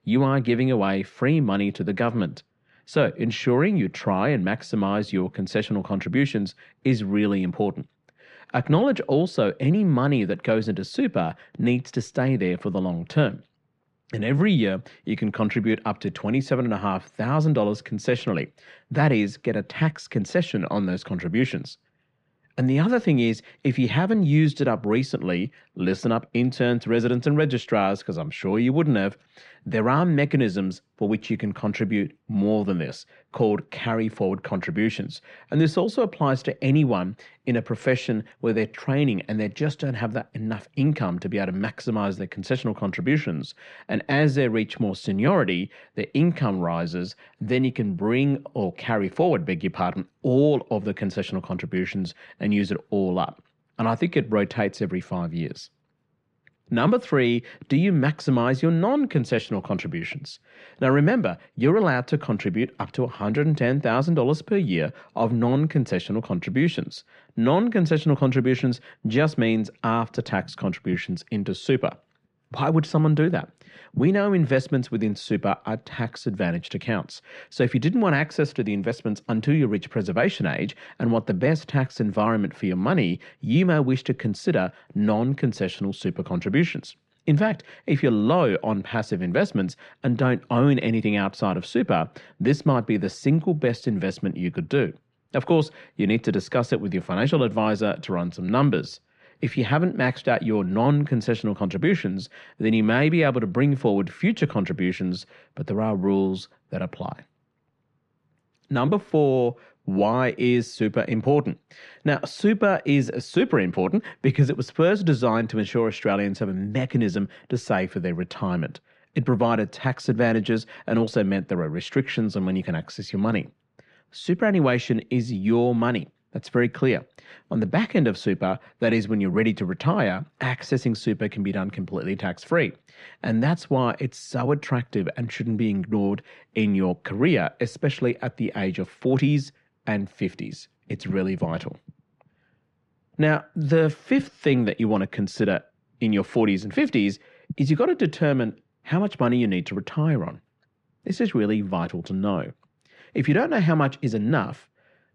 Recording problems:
muffled; slightly; fading above 2.5 kHz

